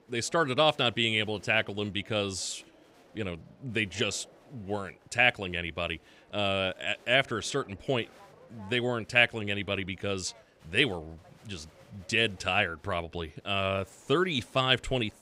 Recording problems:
crowd noise; faint; throughout; 30 dB below the speech

